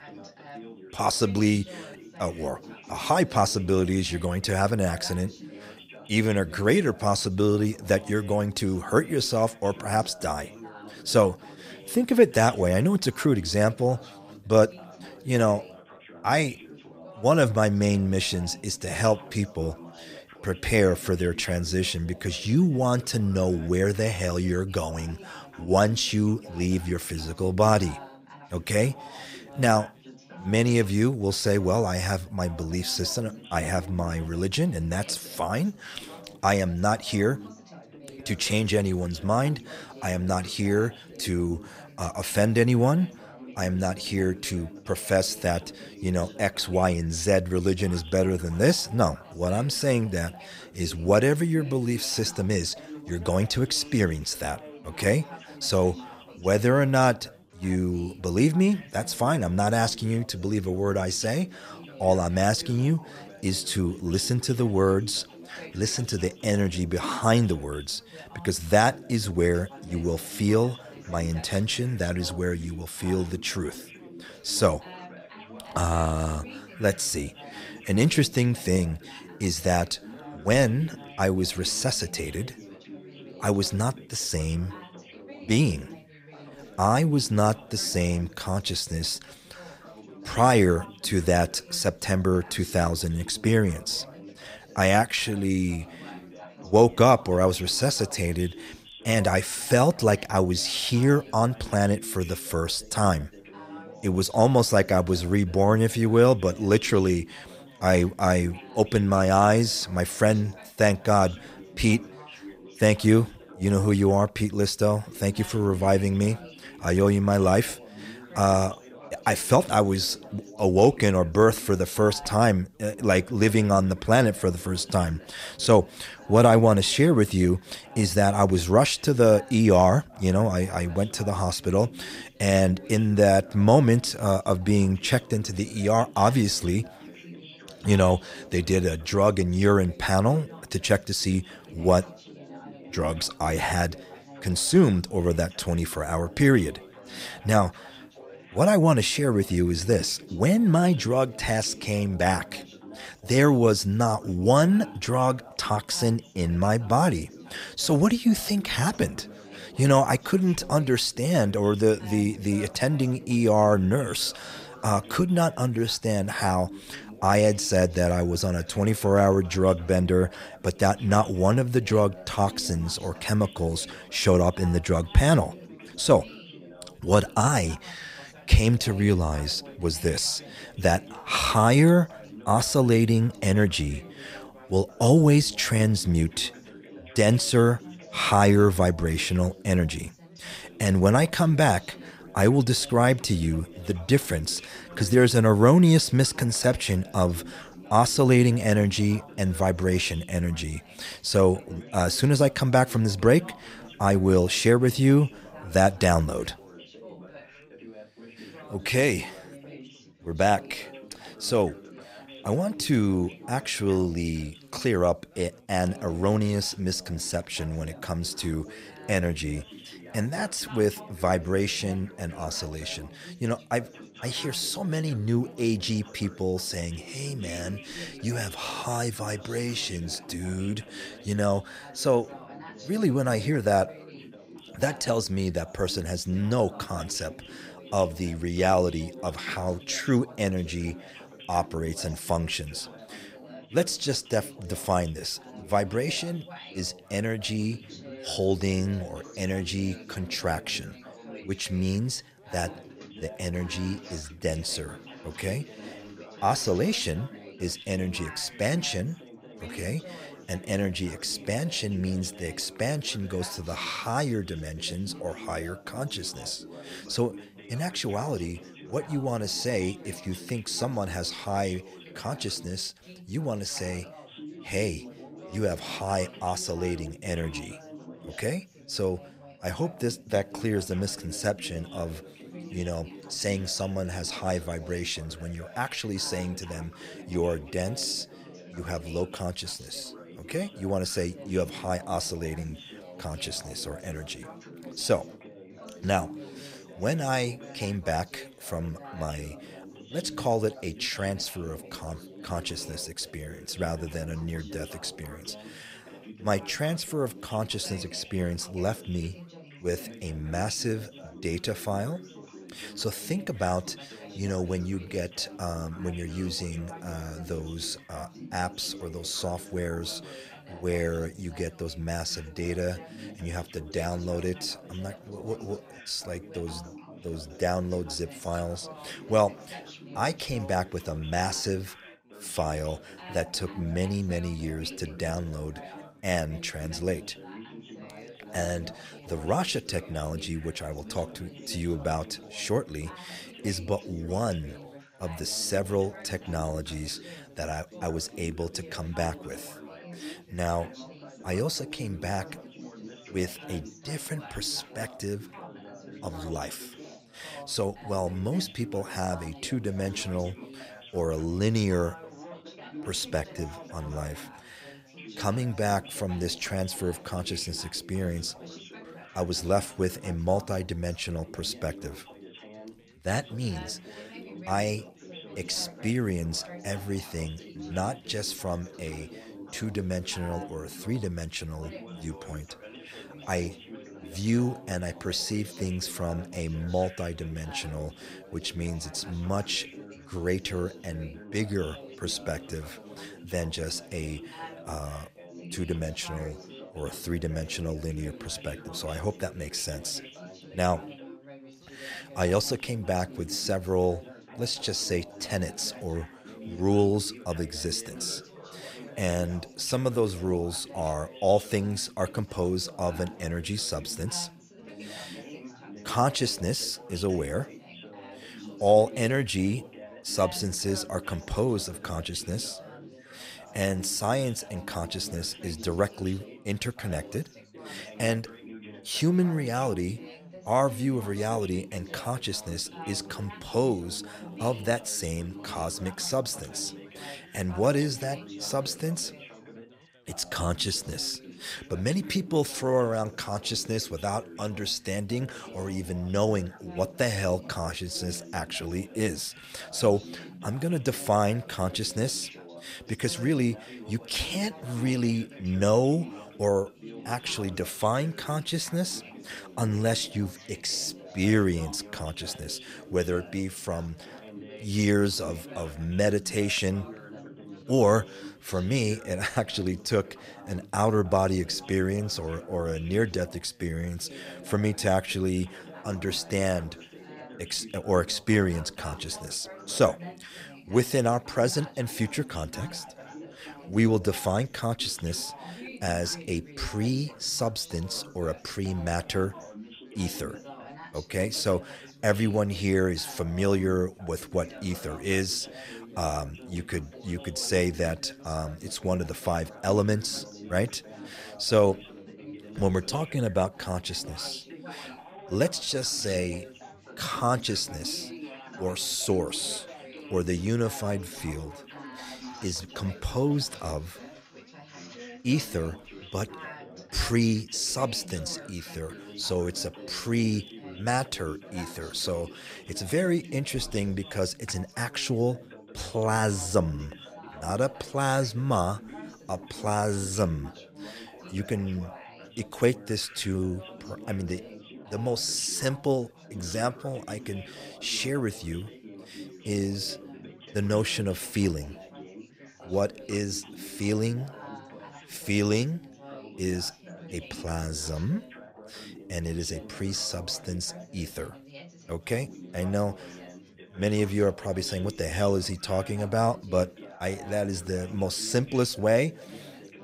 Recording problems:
background chatter; noticeable; throughout; 4 voices, 20 dB below the speech

